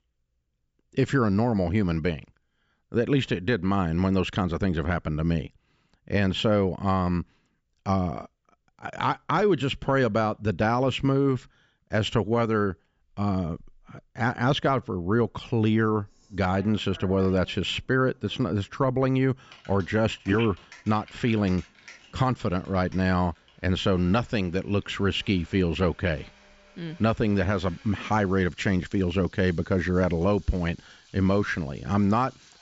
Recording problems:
high frequencies cut off; noticeable; nothing above 8 kHz
household noises; faint; from 16 s on; 25 dB below the speech

